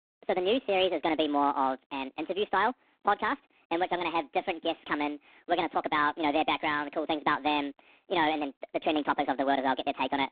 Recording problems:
phone-call audio; poor line; nothing above 3.5 kHz
wrong speed and pitch; too fast and too high; 1.5 times normal speed

